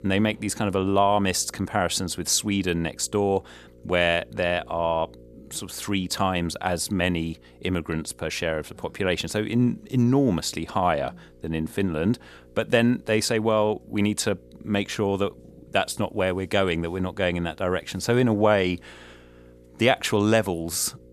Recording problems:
electrical hum; faint; throughout; 60 Hz, 30 dB below the speech

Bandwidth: 13.5 kHz